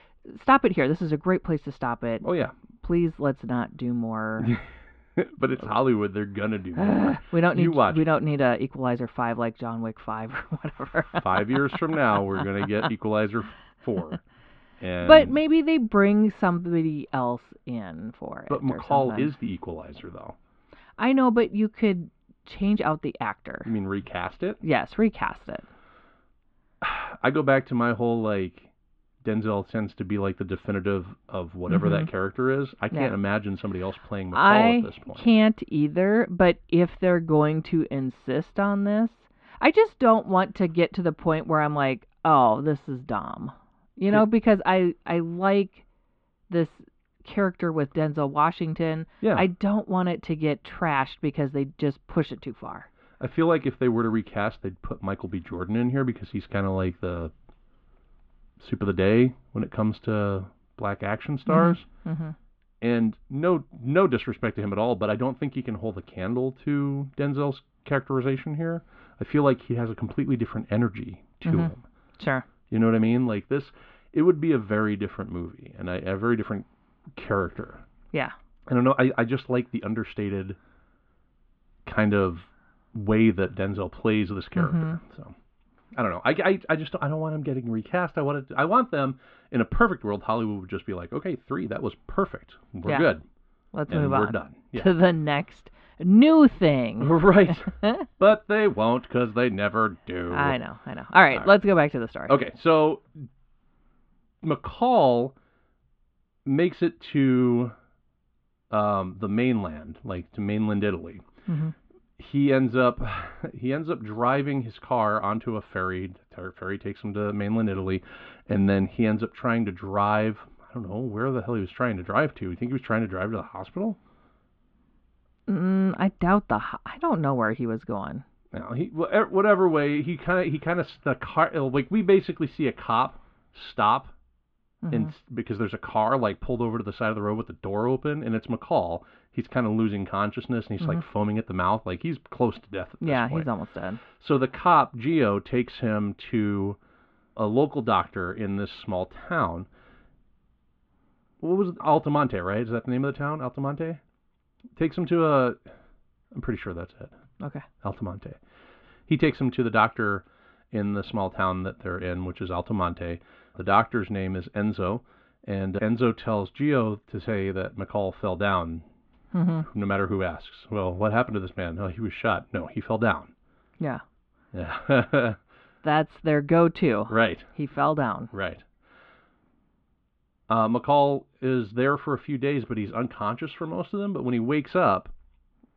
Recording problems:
muffled; very; fading above 3.5 kHz

